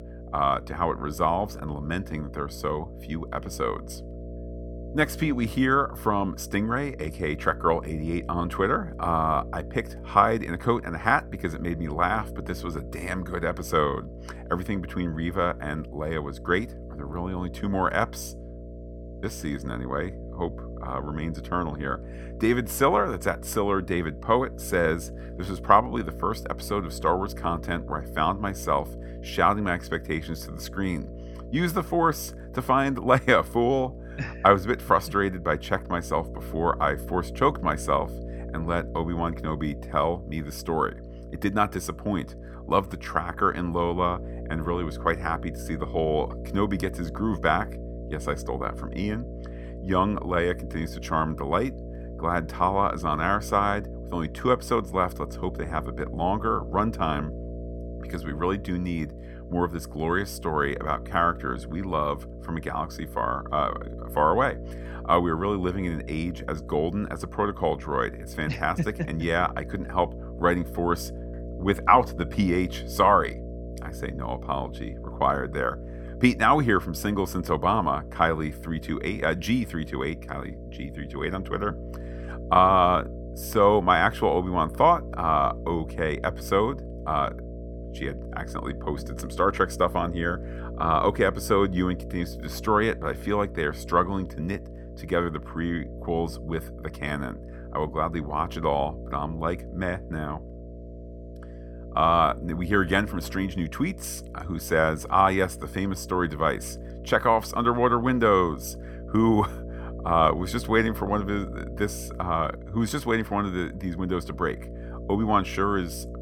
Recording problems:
electrical hum; noticeable; throughout; 60 Hz, 20 dB below the speech

